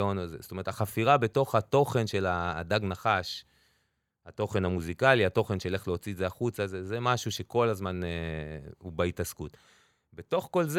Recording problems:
abrupt cut into speech; at the start and the end

